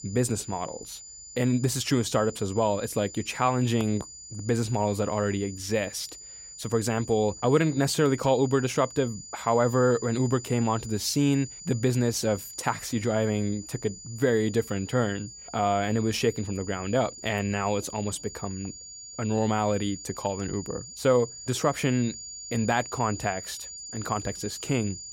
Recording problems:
high-pitched whine; noticeable; throughout; 7 kHz, 15 dB below the speech

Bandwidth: 16 kHz